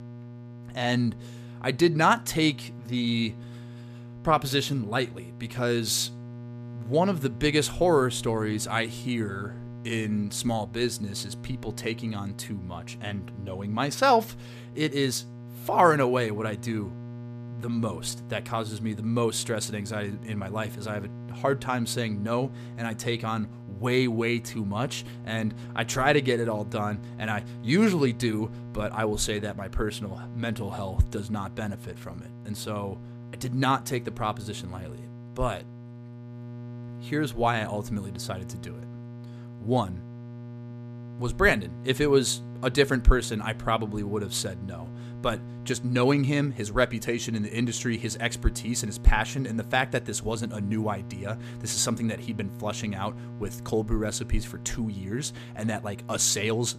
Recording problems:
electrical hum; noticeable; throughout; 60 Hz, 20 dB below the speech

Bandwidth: 14.5 kHz